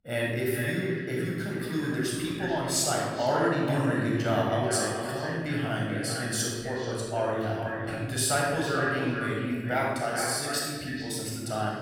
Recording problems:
echo of what is said; strong; throughout; 430 ms later, 6 dB below the speech
room echo; strong; dies away in 1.3 s
off-mic speech; far

